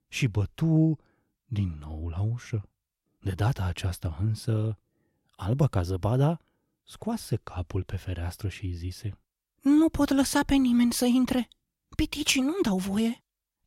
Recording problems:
none

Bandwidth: 16 kHz